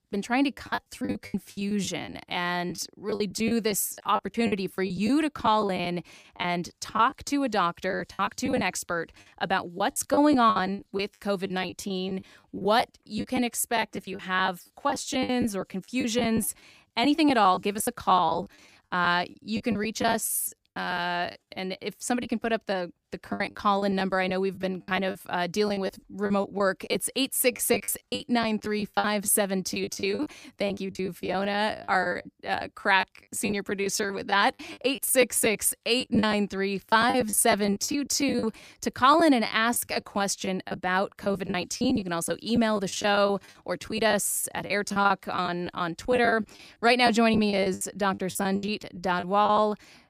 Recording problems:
choppy; very; 15% of the speech affected

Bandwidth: 15 kHz